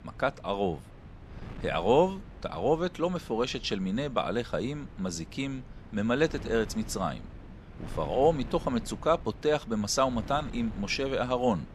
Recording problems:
wind noise on the microphone; occasional gusts; 20 dB below the speech

